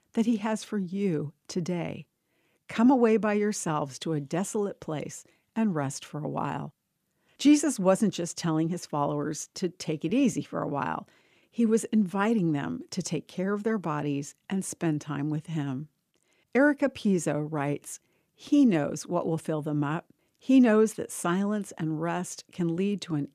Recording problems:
none

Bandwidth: 14.5 kHz